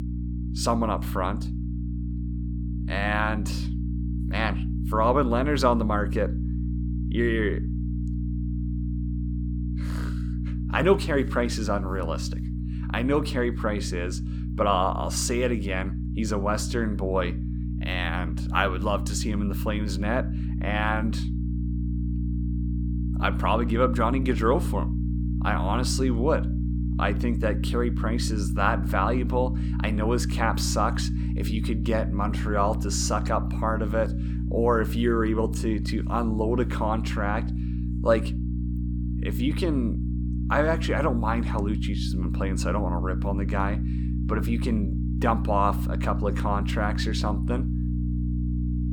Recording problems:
electrical hum; noticeable; throughout; 60 Hz, 10 dB below the speech

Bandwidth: 18.5 kHz